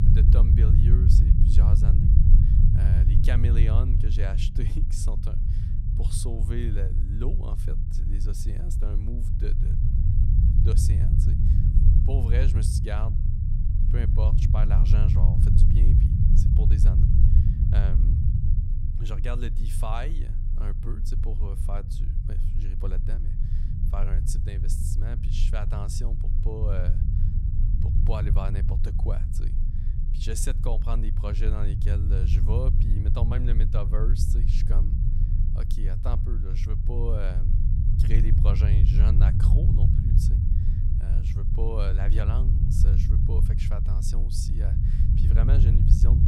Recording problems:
low rumble; loud; throughout; as loud as the speech

